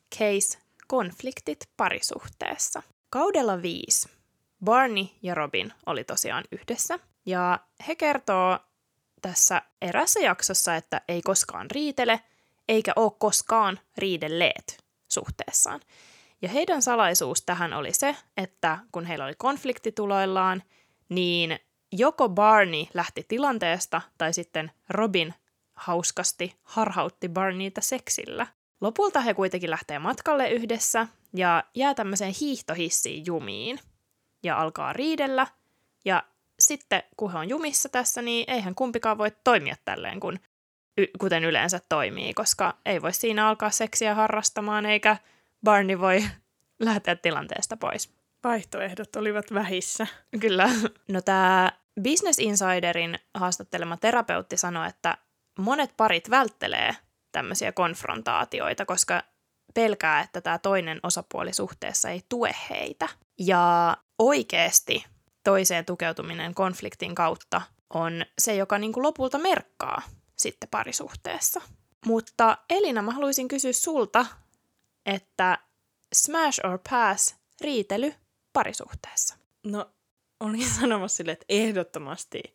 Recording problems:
none

